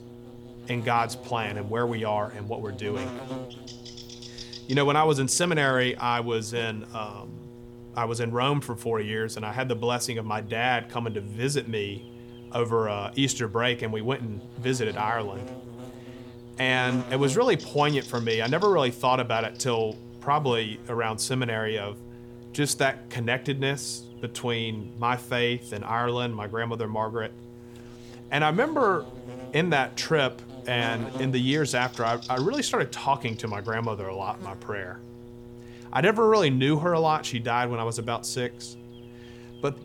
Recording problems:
electrical hum; noticeable; throughout; 60 Hz, 20 dB below the speech

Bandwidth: 18 kHz